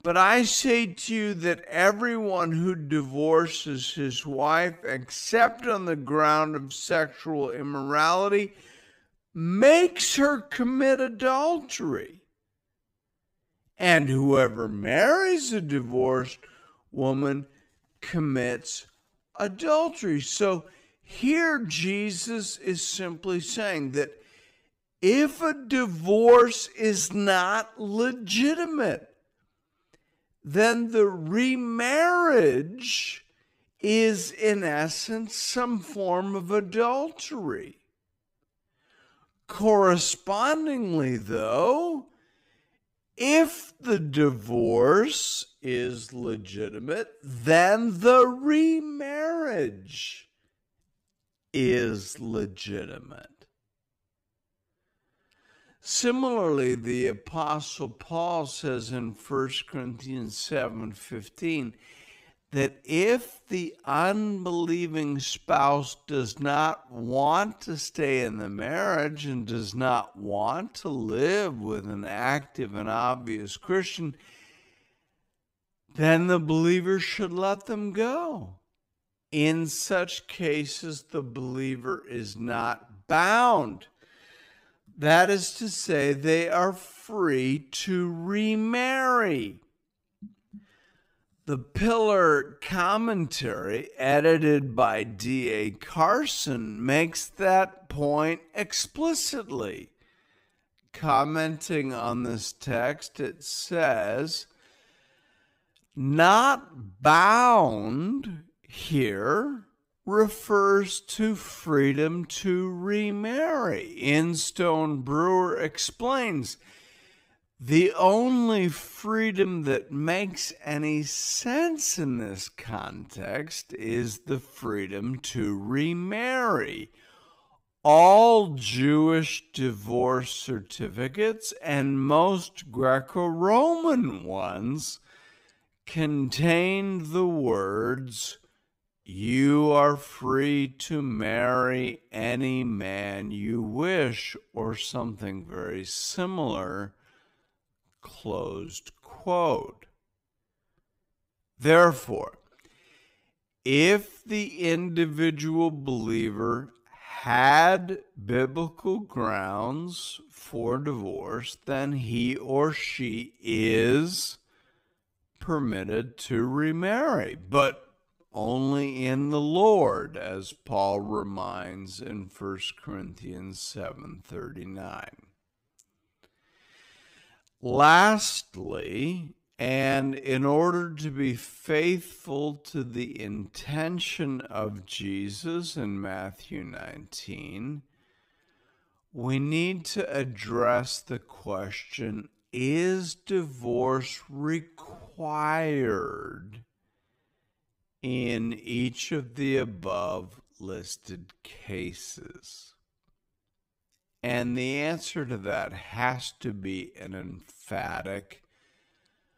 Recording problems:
wrong speed, natural pitch; too slow; 0.5 times normal speed

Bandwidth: 15.5 kHz